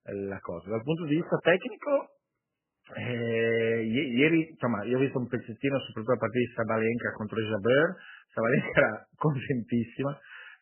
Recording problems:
garbled, watery; badly; nothing above 3 kHz

